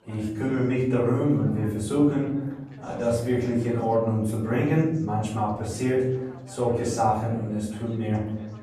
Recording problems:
off-mic speech; far
room echo; noticeable; dies away in 0.8 s
background chatter; faint; throughout; 4 voices, 25 dB below the speech

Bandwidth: 13.5 kHz